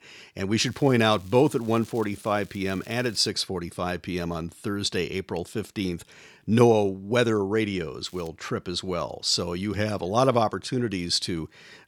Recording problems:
crackling; faint; from 0.5 to 3.5 s and at 8 s; 25 dB below the speech

